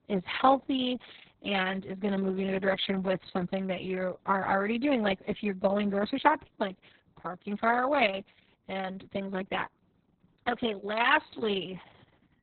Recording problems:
garbled, watery; badly; nothing above 4 kHz

